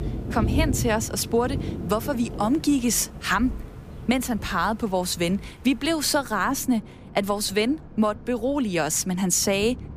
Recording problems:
rain or running water; noticeable; throughout; 10 dB below the speech

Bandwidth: 15 kHz